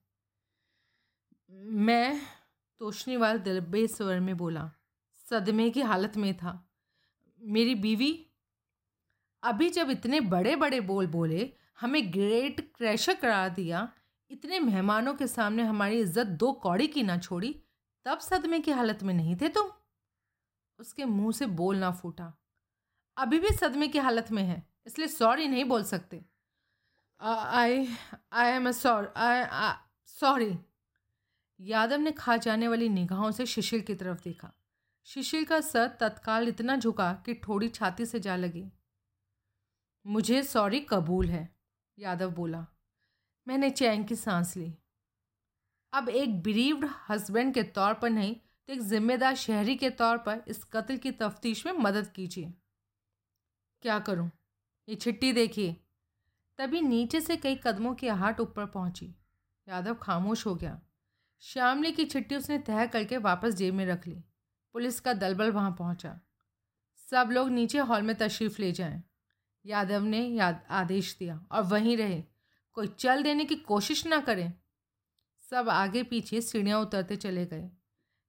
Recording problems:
none

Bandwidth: 16 kHz